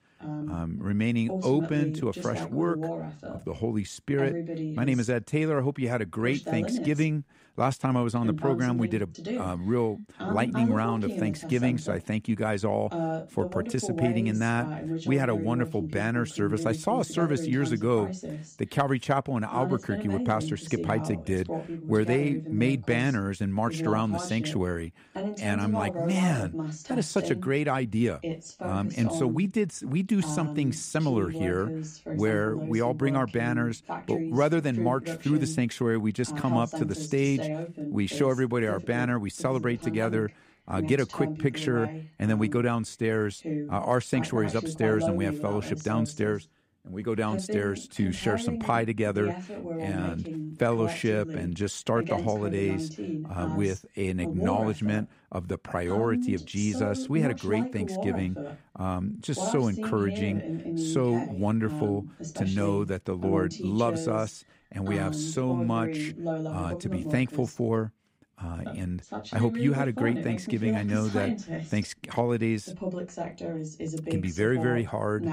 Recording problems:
voice in the background; loud; throughout; 6 dB below the speech

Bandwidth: 15.5 kHz